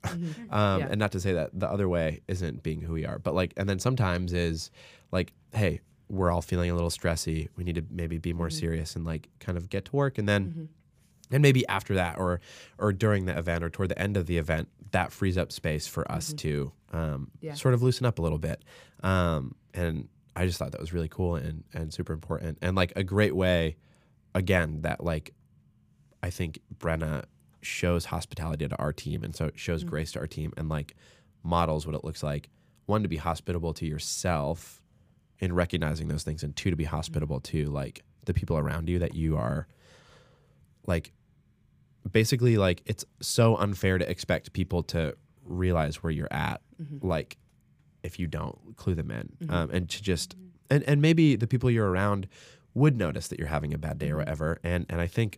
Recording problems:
none

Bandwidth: 15 kHz